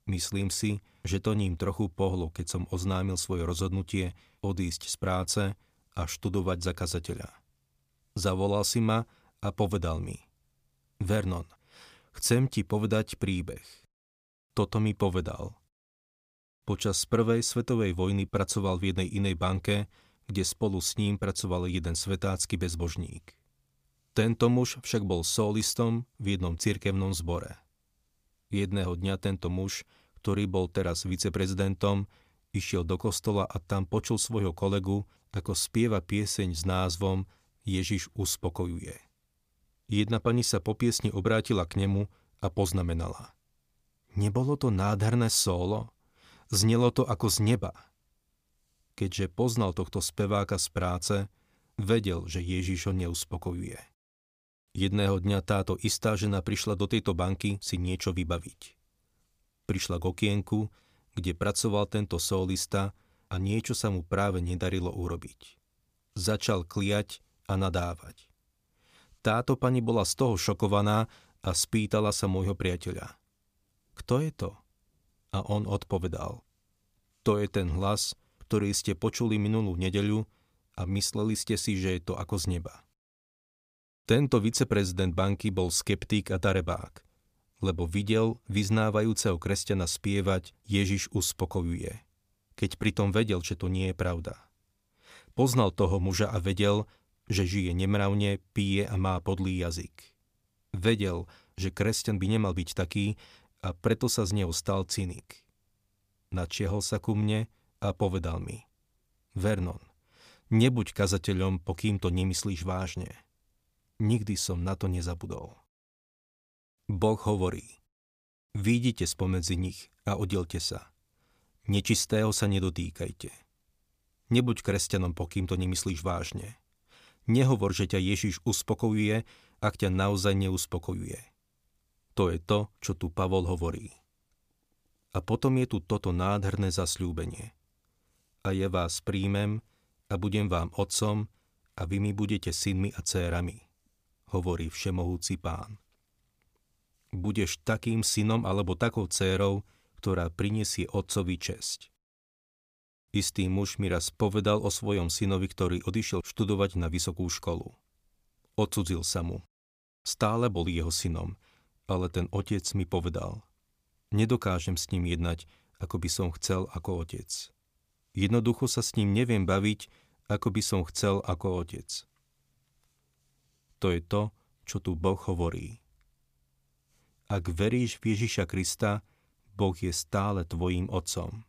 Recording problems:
none

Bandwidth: 15 kHz